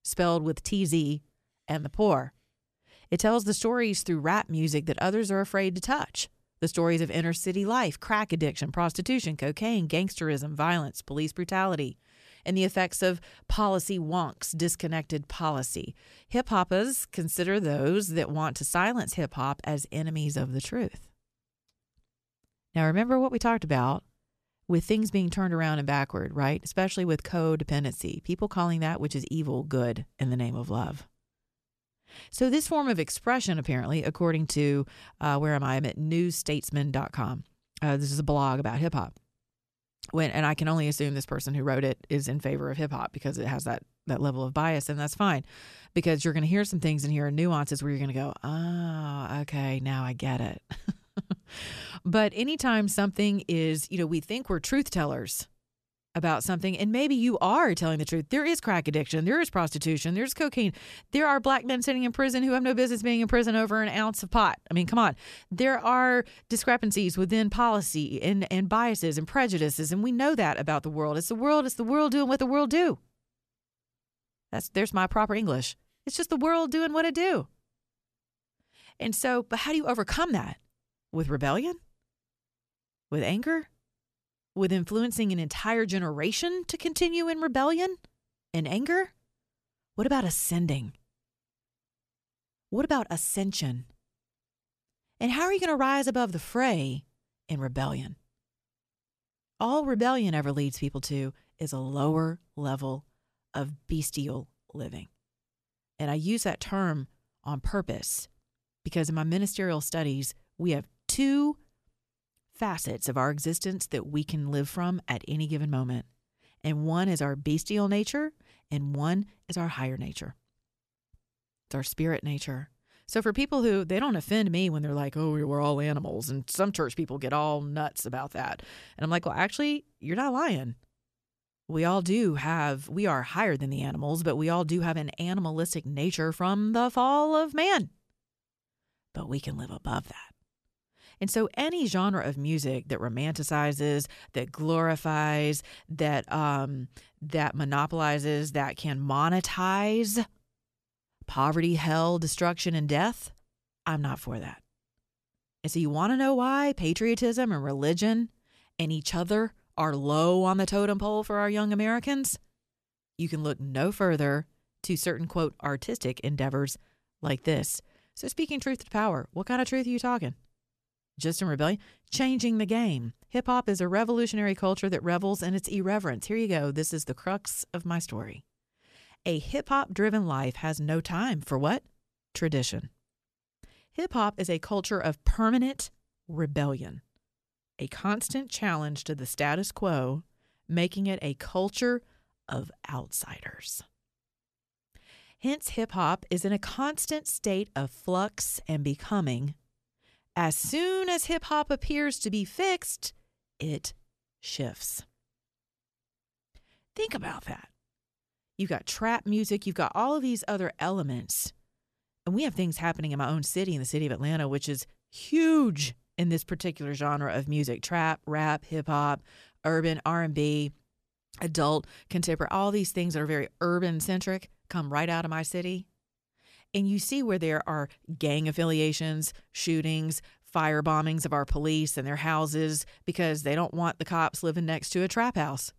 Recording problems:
none

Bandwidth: 14 kHz